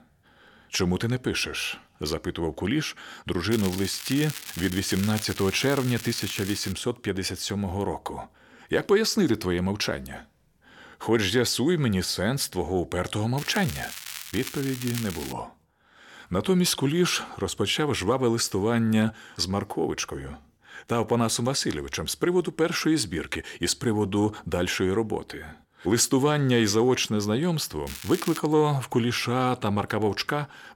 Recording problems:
crackling; noticeable; from 3.5 to 6.5 s, from 13 to 15 s and at 28 s; 10 dB below the speech

